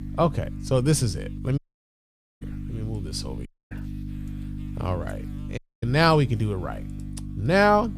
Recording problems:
electrical hum; noticeable; throughout; 50 Hz, 20 dB below the speech
audio cutting out; at 1.5 s for 1 s, at 3.5 s and at 5.5 s

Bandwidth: 14.5 kHz